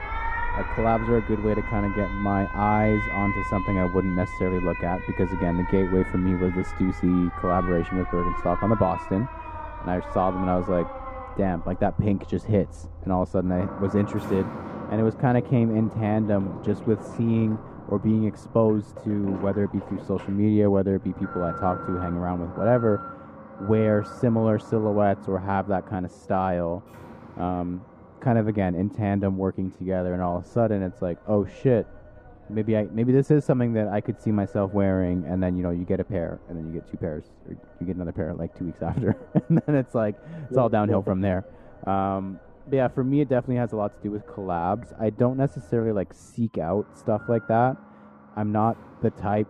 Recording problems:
muffled; very; fading above 2 kHz
alarms or sirens; noticeable; throughout; 10 dB below the speech

